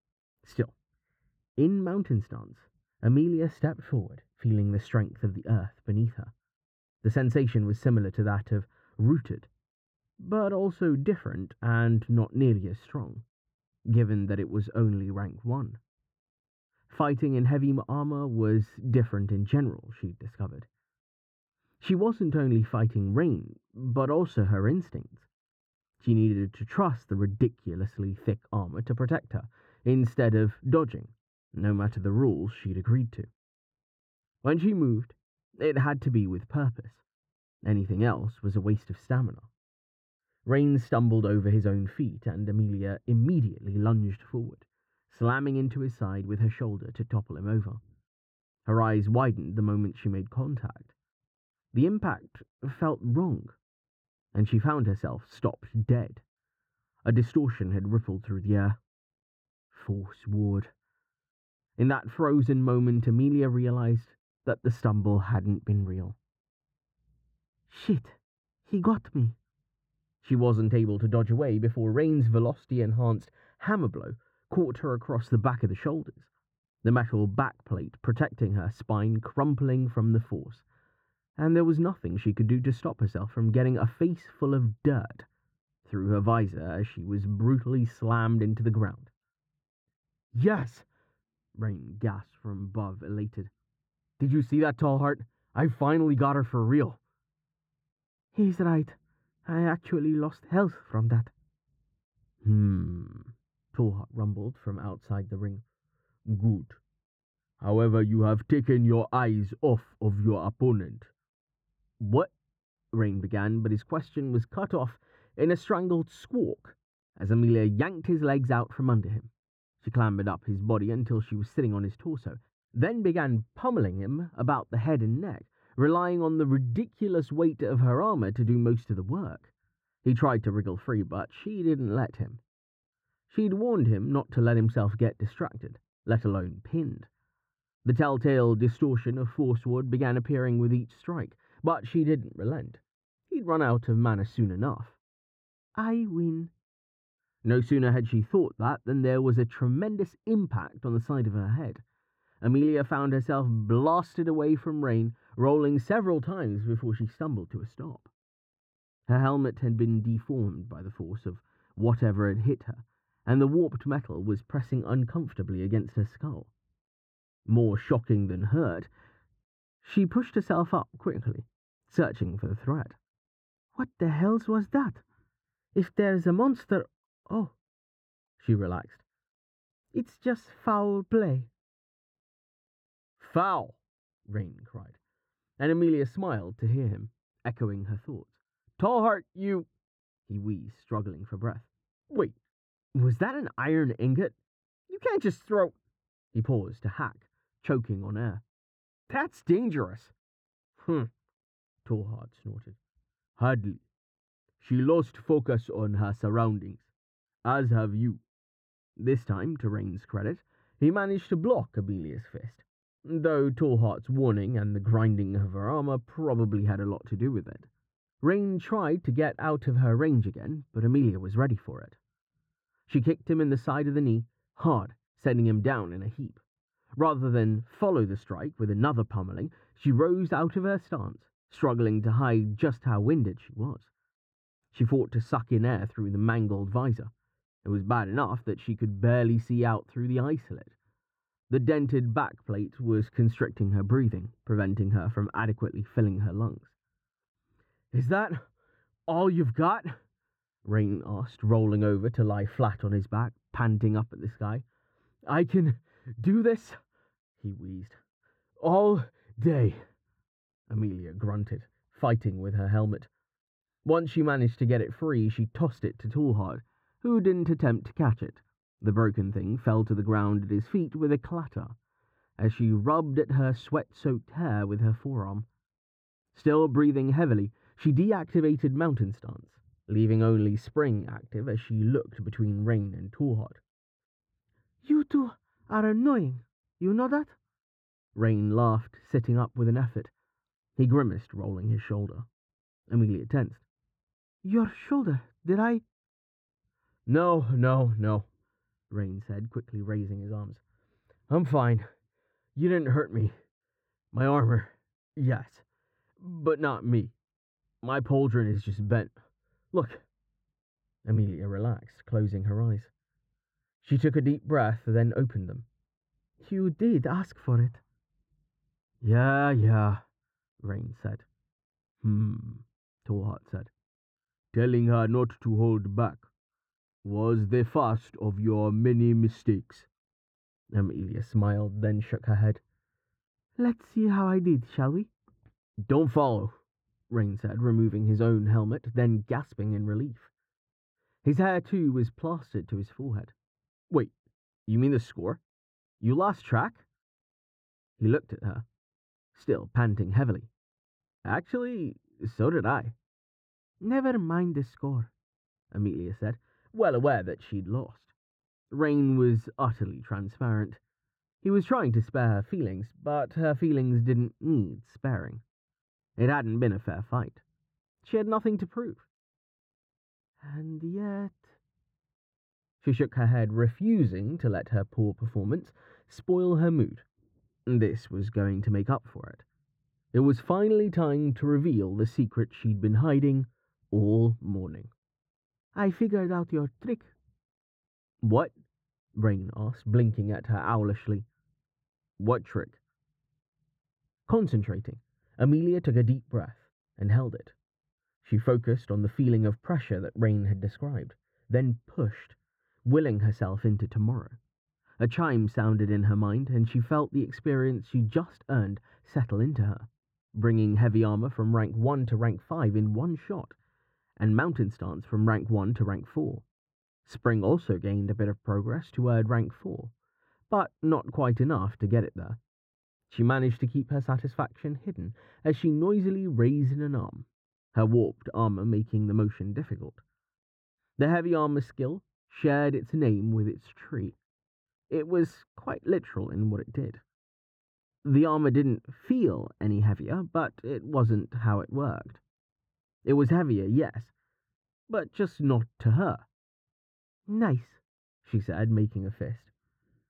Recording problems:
muffled; very; fading above 2 kHz

